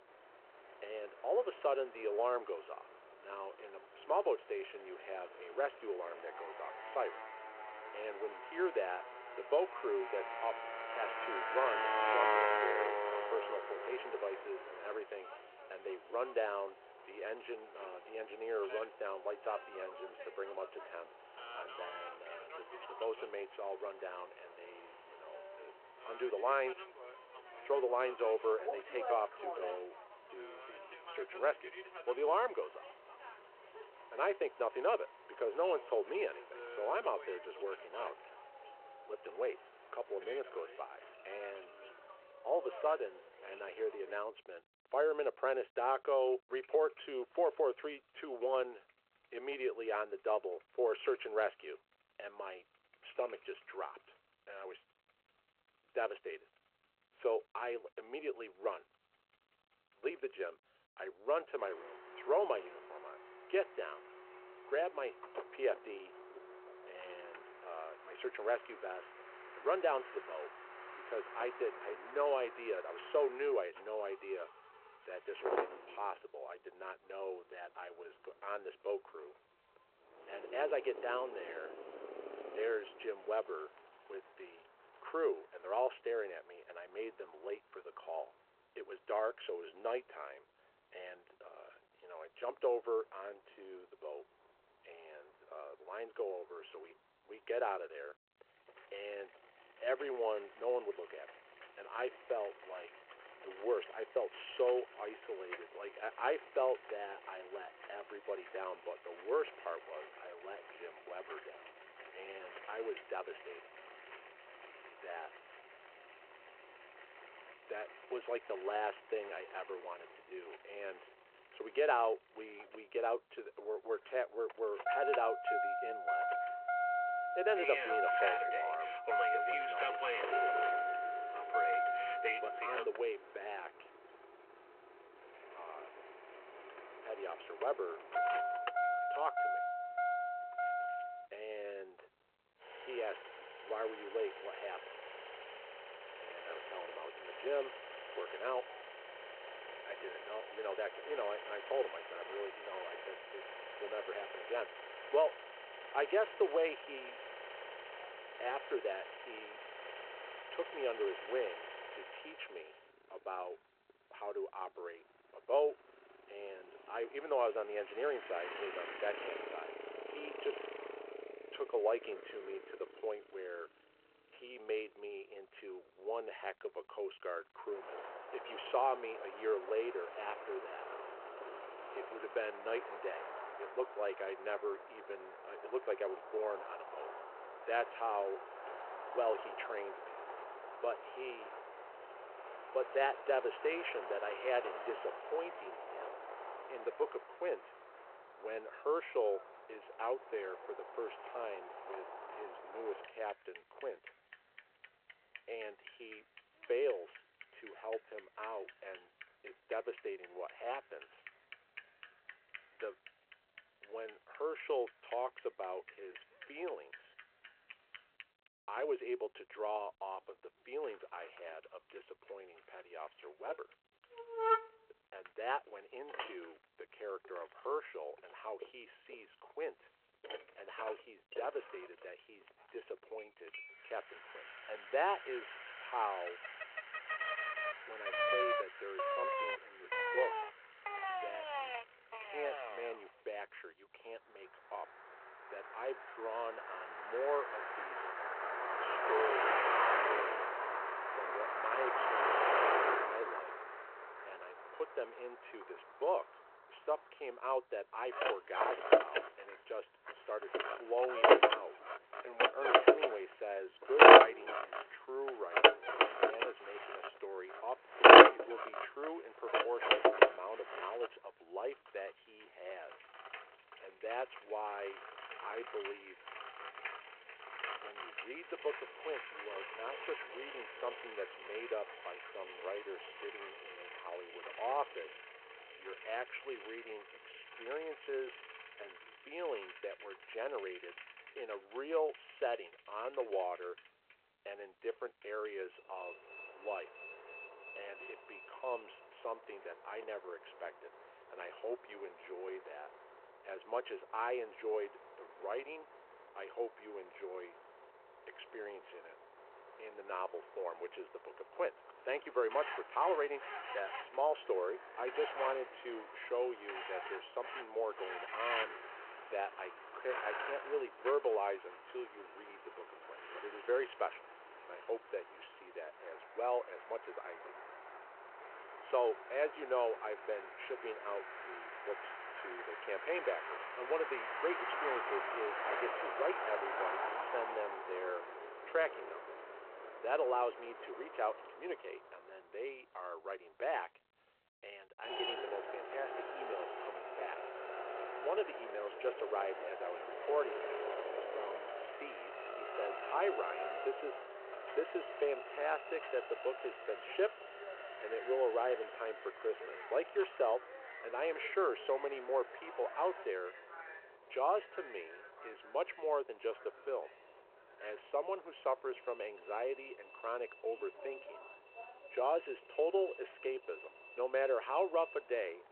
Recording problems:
phone-call audio
traffic noise; very loud; throughout; 4 dB above the speech

